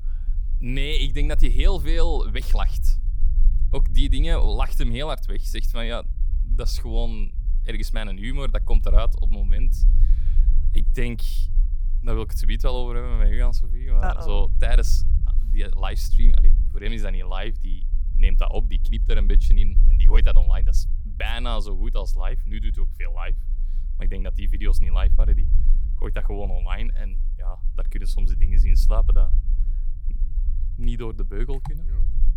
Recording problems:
low rumble; noticeable; throughout; 15 dB below the speech

